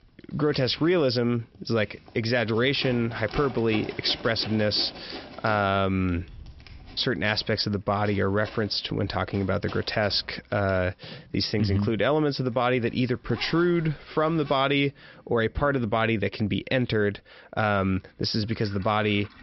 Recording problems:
high frequencies cut off; noticeable; nothing above 5.5 kHz
household noises; noticeable; throughout; 20 dB below the speech

